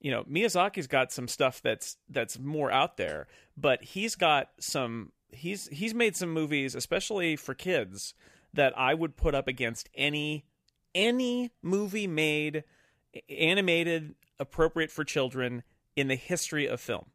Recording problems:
none

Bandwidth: 15 kHz